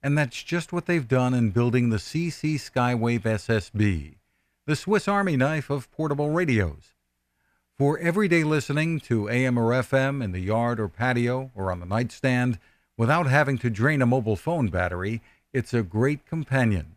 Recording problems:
none

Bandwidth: 14.5 kHz